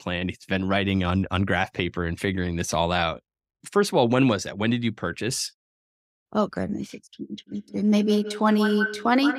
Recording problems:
echo of what is said; strong; from 7.5 s on; 170 ms later, 7 dB below the speech

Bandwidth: 15.5 kHz